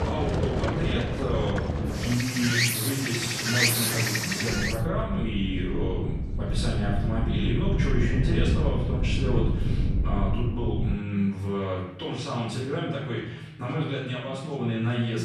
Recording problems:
off-mic speech; far
room echo; noticeable; dies away in 0.8 s
animal sounds; very loud; until 4.5 s; 3 dB above the speech
wind noise on the microphone; heavy; from 4.5 to 11 s; 7 dB below the speech
voice in the background; noticeable; throughout; 15 dB below the speech

